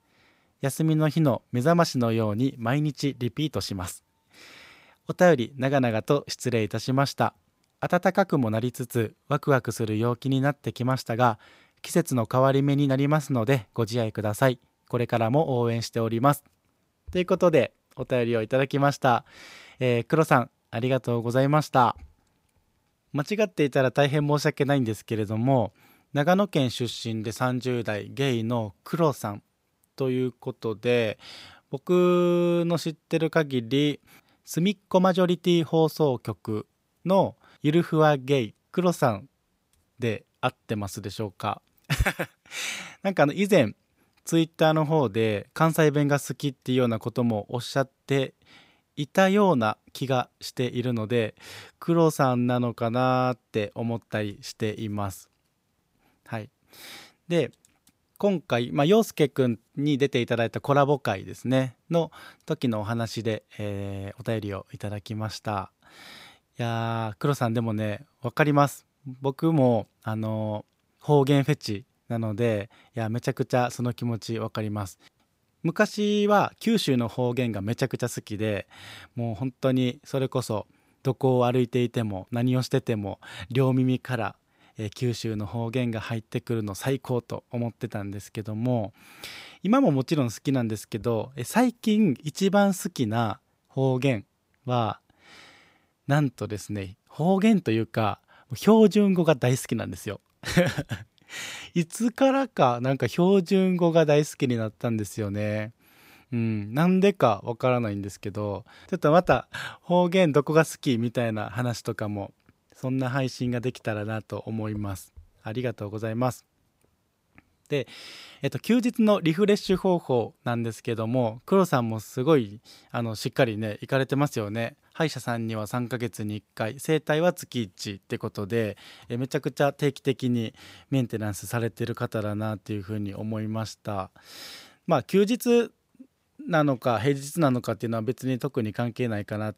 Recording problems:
none

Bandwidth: 15.5 kHz